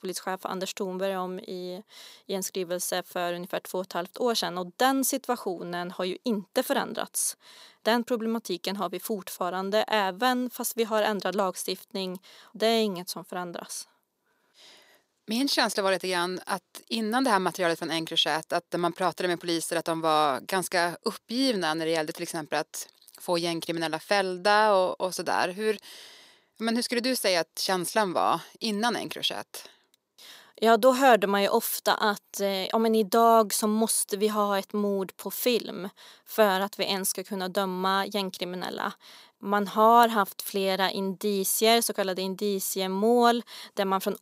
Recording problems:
thin; very slightly; fading below 300 Hz

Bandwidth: 15.5 kHz